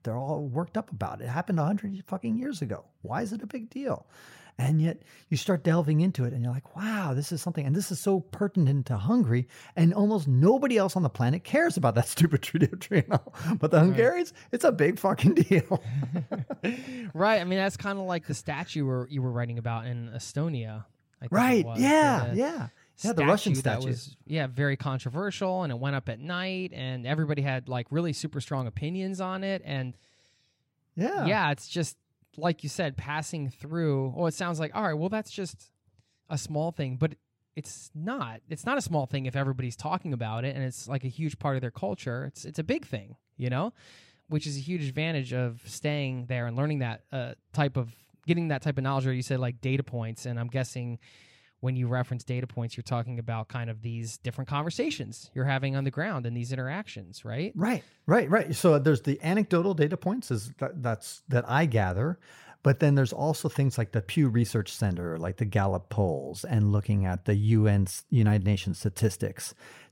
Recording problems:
none

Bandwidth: 16 kHz